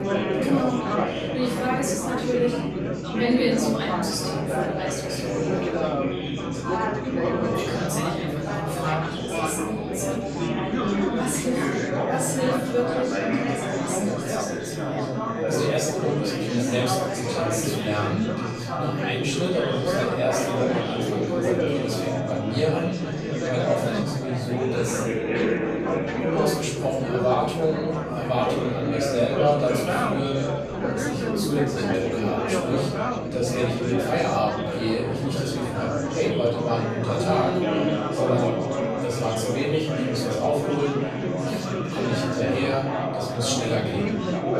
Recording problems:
off-mic speech; far
room echo; noticeable; dies away in 0.6 s
chatter from many people; very loud; throughout; 1 dB above the speech
background music; faint; throughout; 20 dB below the speech

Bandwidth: 14.5 kHz